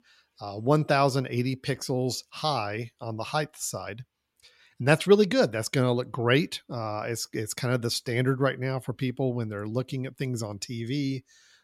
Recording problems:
none

